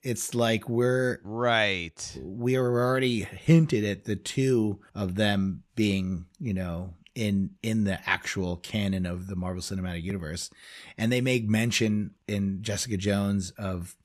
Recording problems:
none

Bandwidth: 13.5 kHz